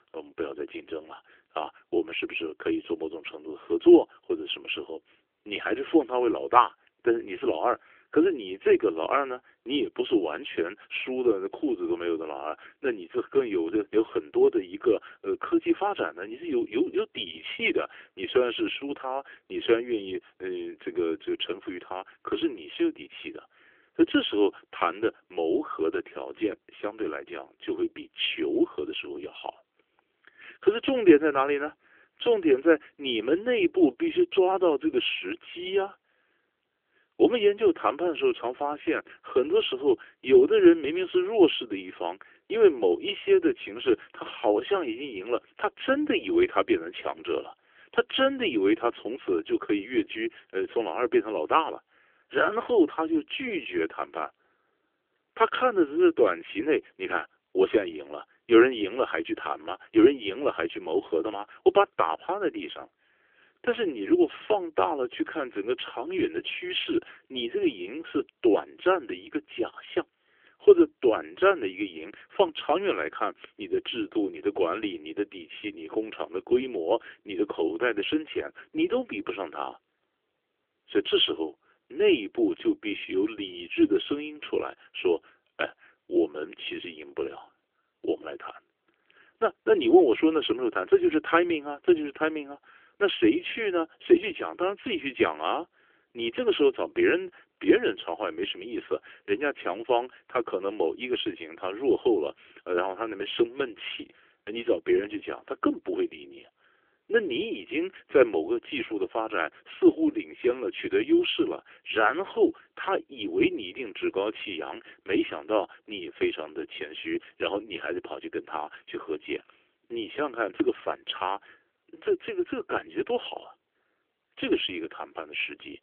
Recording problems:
phone-call audio; nothing above 3.5 kHz

